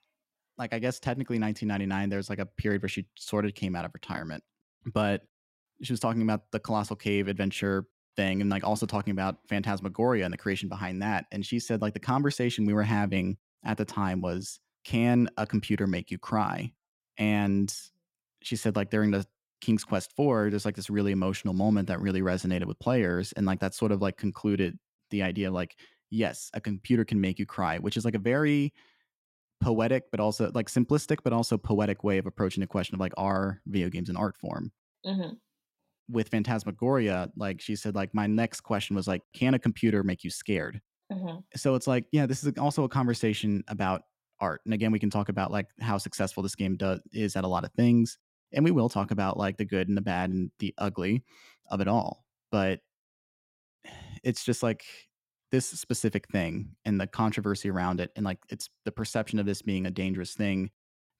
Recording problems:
none

